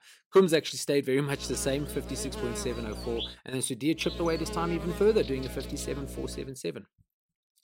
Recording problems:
electrical hum; loud; from 1.5 to 3.5 s and from 4 to 6.5 s; 60 Hz, 9 dB below the speech

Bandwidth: 16 kHz